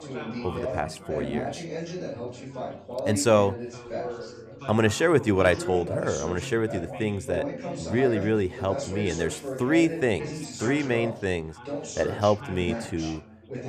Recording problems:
background chatter; loud; throughout; 4 voices, 8 dB below the speech

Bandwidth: 15 kHz